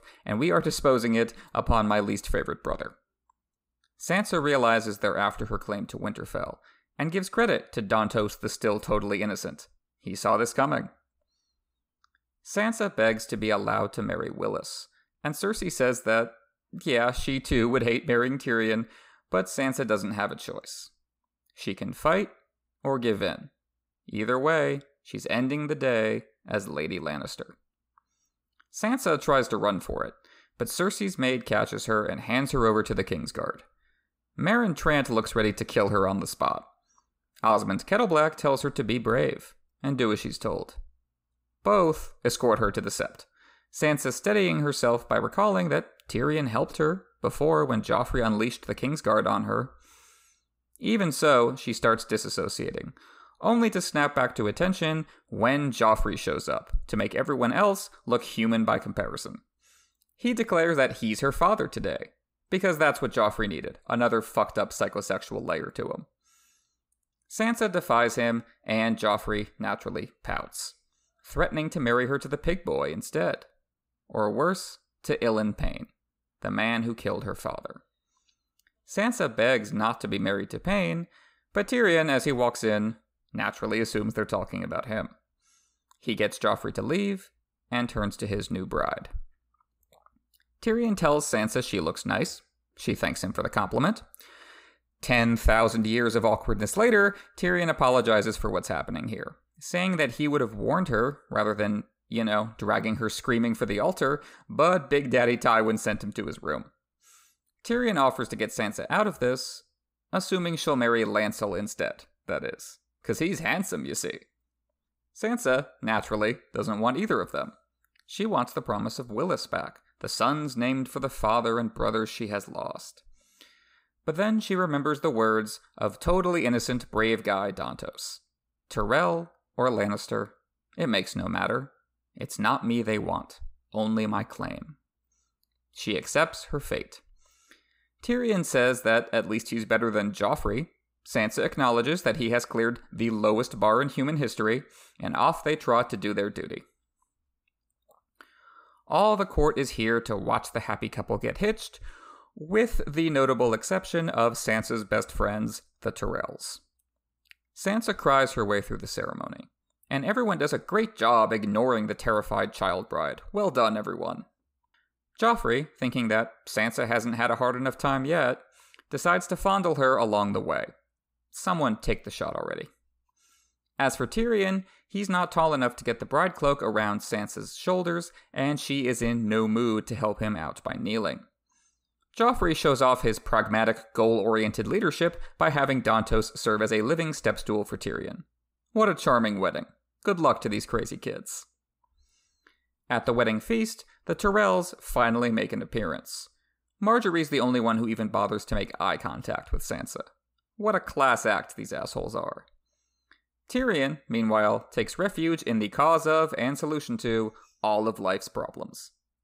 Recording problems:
none

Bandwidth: 15.5 kHz